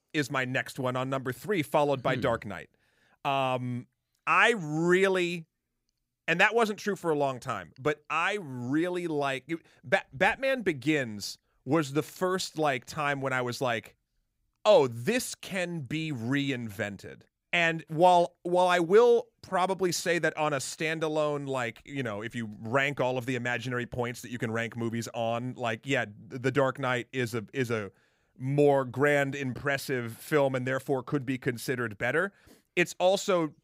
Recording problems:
none

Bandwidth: 15.5 kHz